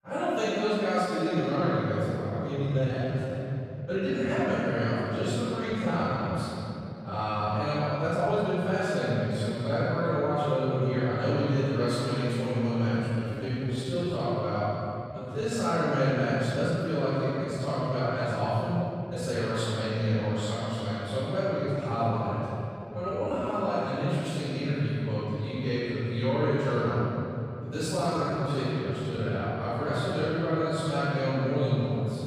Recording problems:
room echo; strong; dies away in 3 s
off-mic speech; far
uneven, jittery; strongly; from 1 to 29 s

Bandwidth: 15.5 kHz